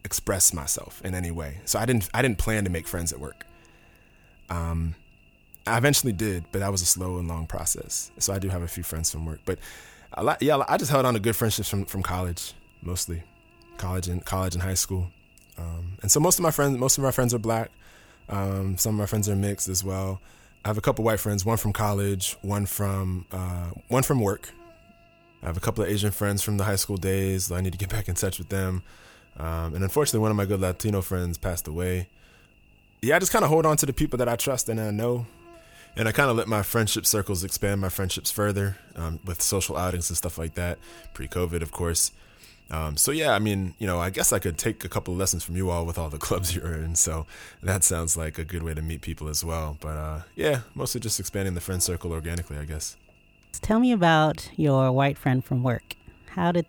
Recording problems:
electrical hum; faint; throughout; 50 Hz, 30 dB below the speech

